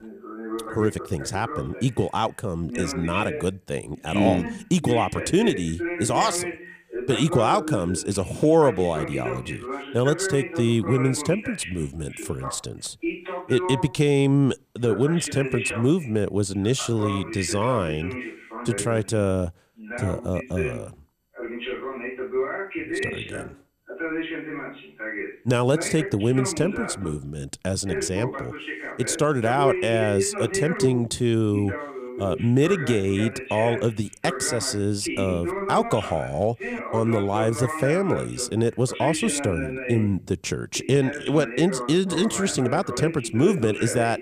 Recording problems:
voice in the background; loud; throughout; 8 dB below the speech

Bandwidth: 15 kHz